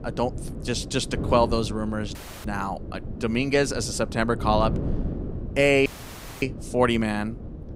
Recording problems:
wind noise on the microphone; occasional gusts; 15 dB below the speech
audio cutting out; at 2 s and at 6 s for 0.5 s

